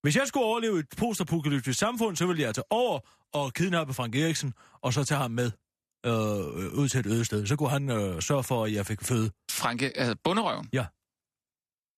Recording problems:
none

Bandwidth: 14.5 kHz